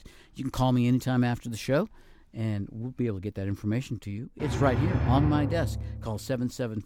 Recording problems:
background music; loud; throughout; 2 dB below the speech

